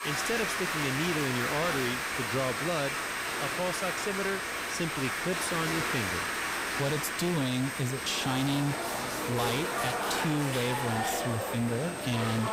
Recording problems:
distortion; slight; 19% of the sound clipped
crowd noise; very loud; throughout; as loud as the speech
high-pitched whine; noticeable; throughout; 8.5 kHz, 15 dB below the speech
hiss; faint; throughout; 25 dB below the speech

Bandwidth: 15.5 kHz